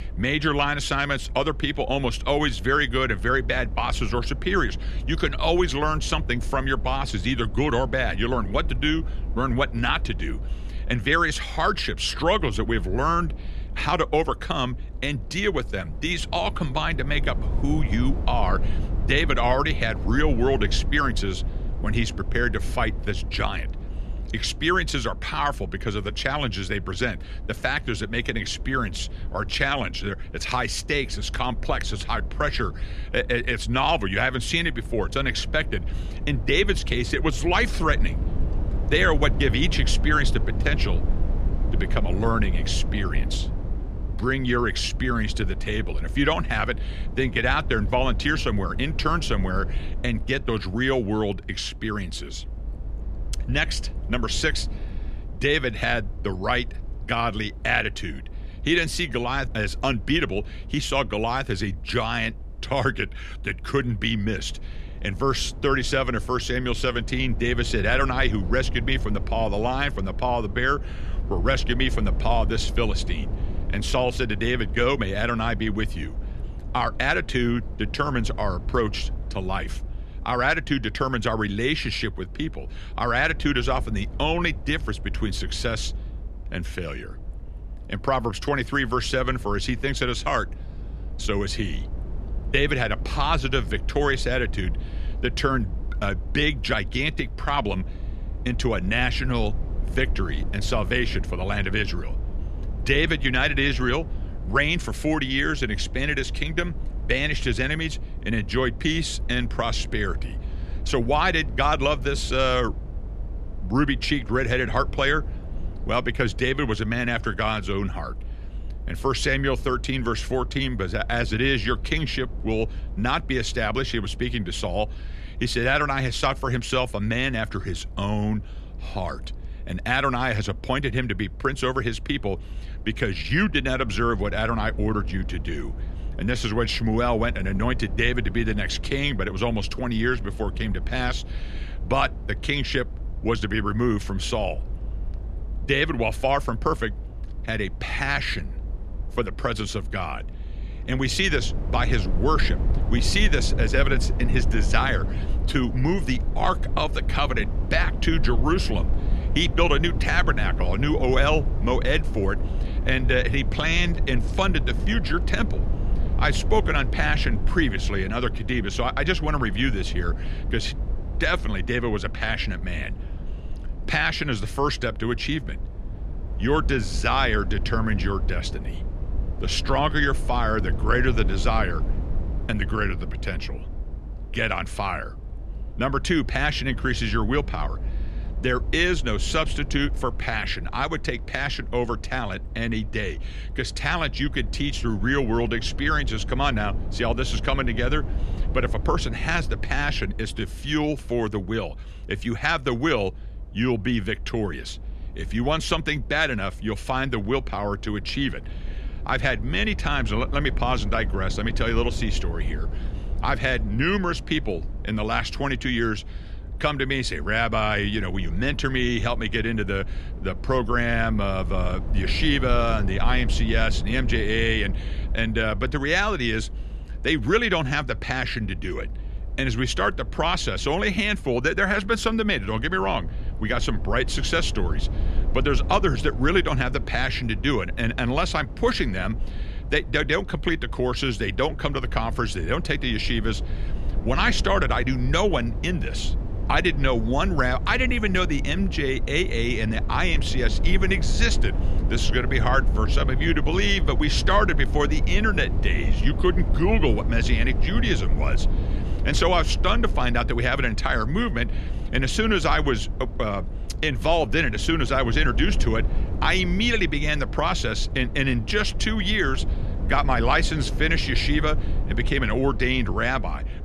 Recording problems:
low rumble; noticeable; throughout; 20 dB below the speech

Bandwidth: 13.5 kHz